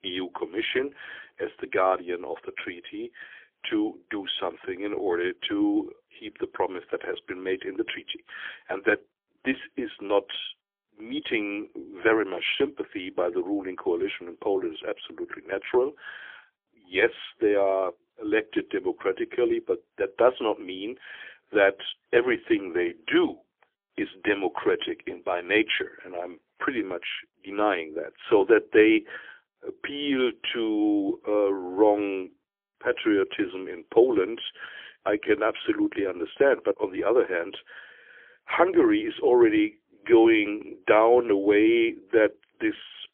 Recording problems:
phone-call audio; poor line; nothing above 3.5 kHz

